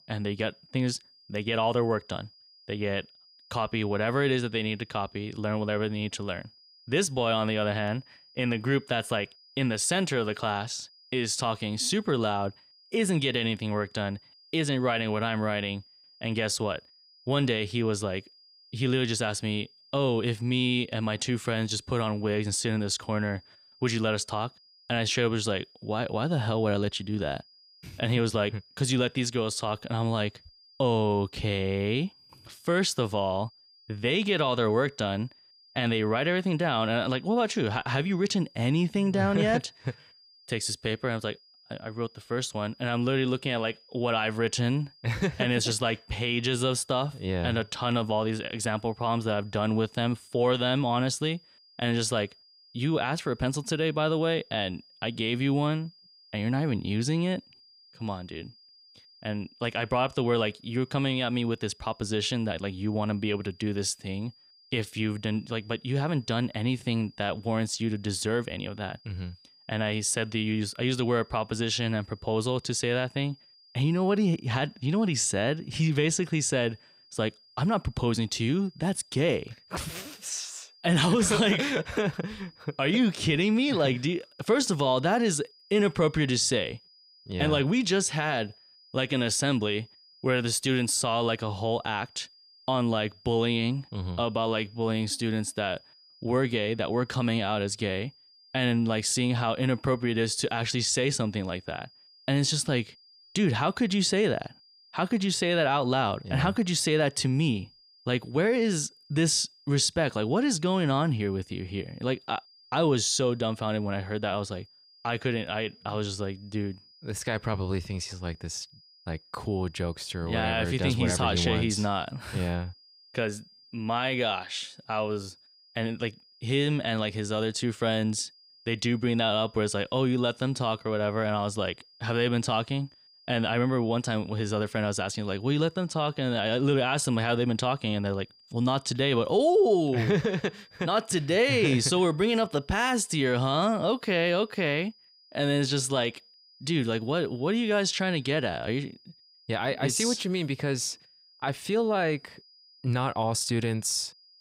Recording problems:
high-pitched whine; faint; throughout; 5 kHz, 25 dB below the speech

